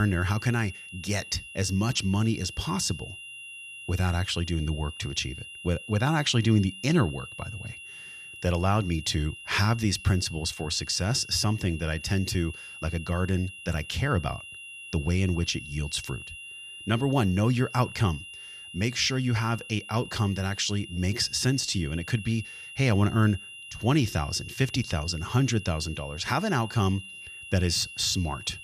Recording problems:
high-pitched whine; noticeable; throughout; 3 kHz, 15 dB below the speech
abrupt cut into speech; at the start

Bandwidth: 14.5 kHz